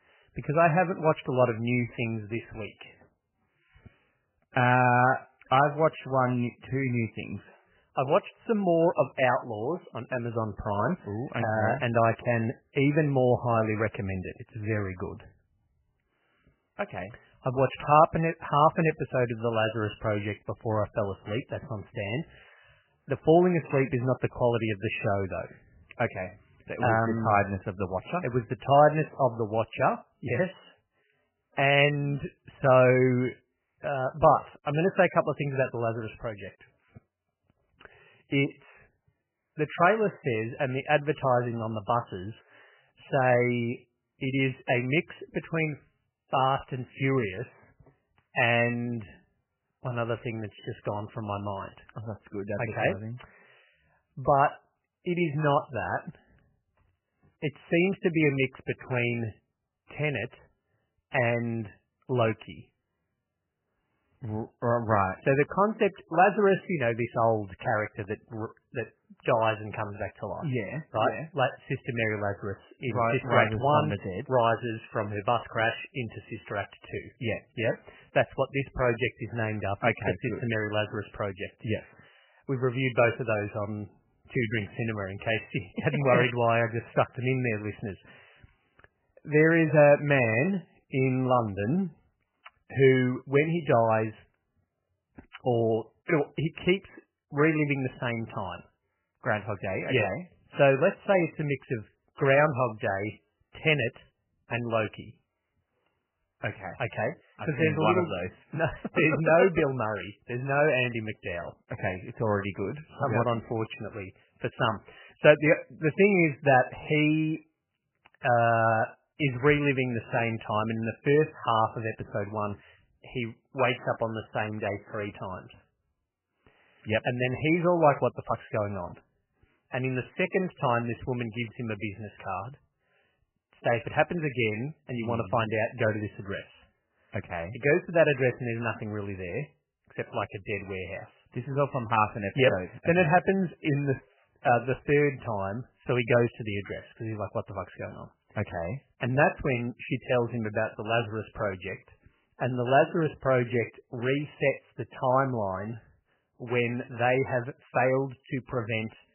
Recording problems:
garbled, watery; badly; nothing above 3 kHz

